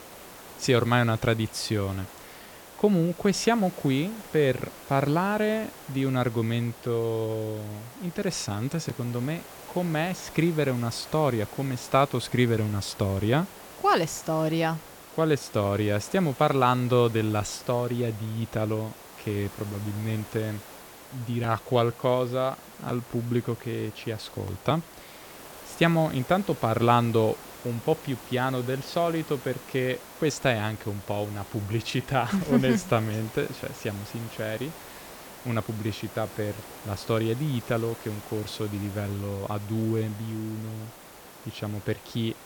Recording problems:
hiss; noticeable; throughout; 15 dB below the speech

